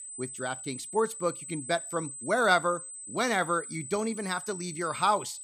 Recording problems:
high-pitched whine; loud; throughout; 8 kHz, 9 dB below the speech

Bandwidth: 15 kHz